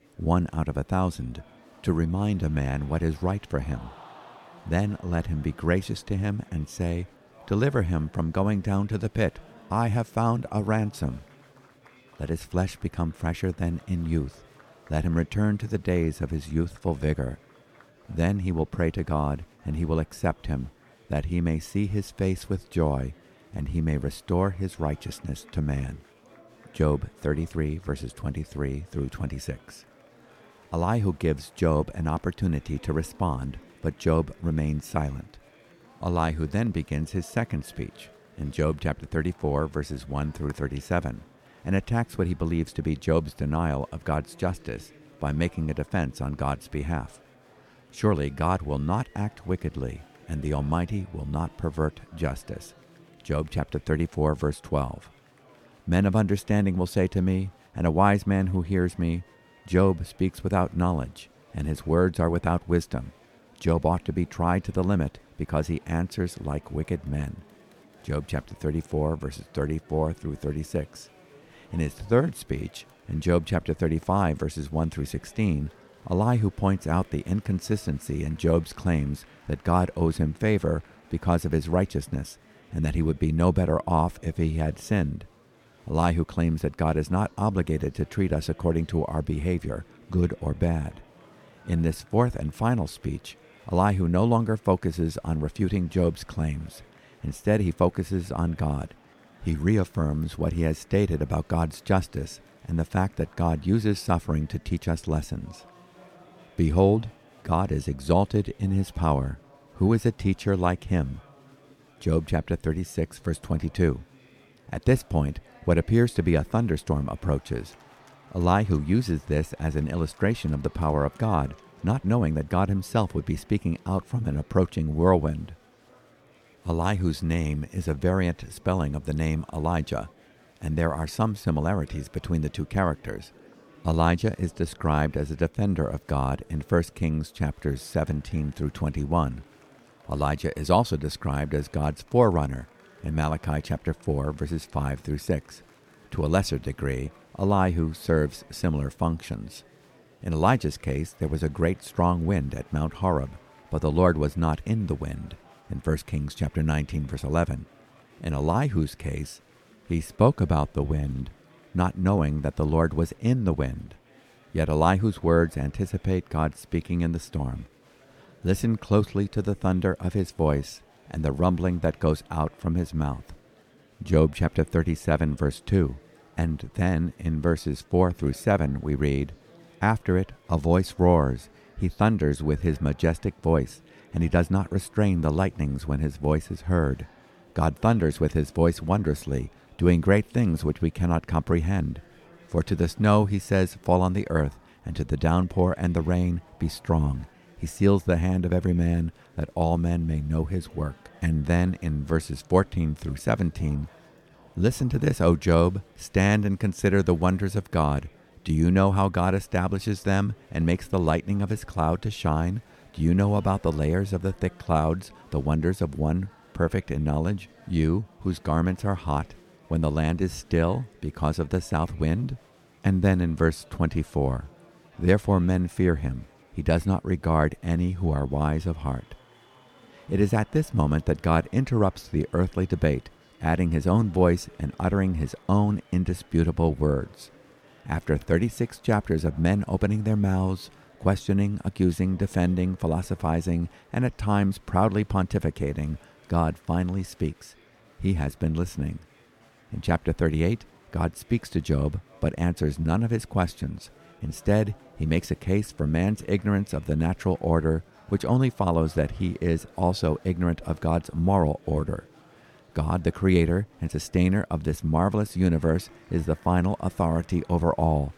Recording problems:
murmuring crowd; faint; throughout; 30 dB below the speech

